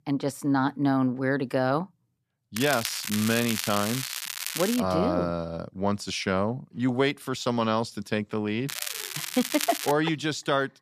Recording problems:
crackling; loud; from 2.5 to 5 s and from 8.5 to 10 s; 5 dB below the speech

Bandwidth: 14.5 kHz